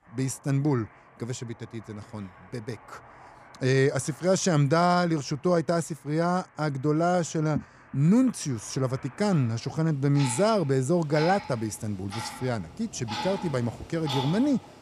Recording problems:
household noises; noticeable; throughout; 15 dB below the speech

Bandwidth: 15 kHz